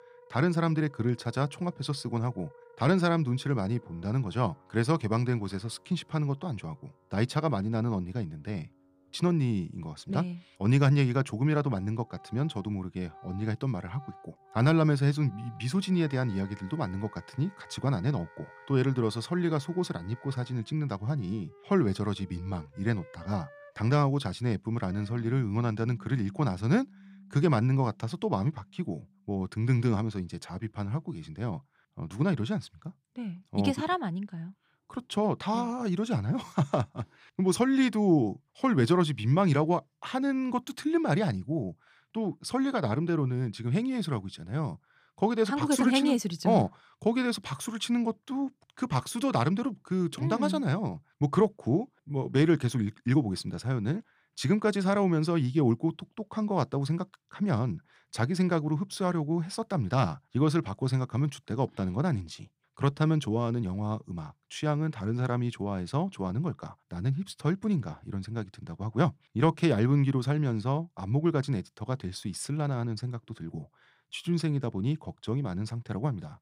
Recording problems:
background music; faint; until 30 s; 25 dB below the speech

